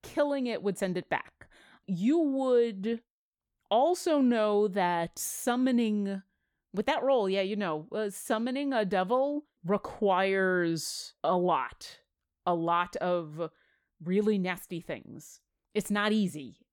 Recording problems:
none

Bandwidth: 17.5 kHz